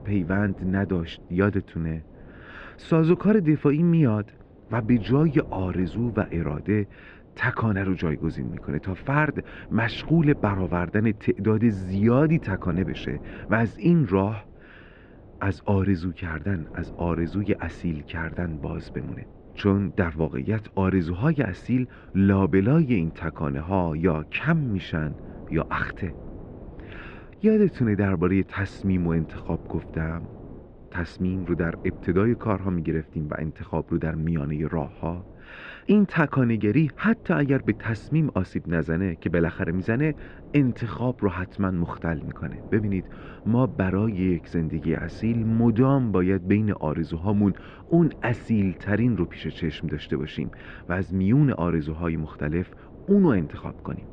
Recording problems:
muffled; very; fading above 3 kHz
wind noise on the microphone; occasional gusts; 20 dB below the speech

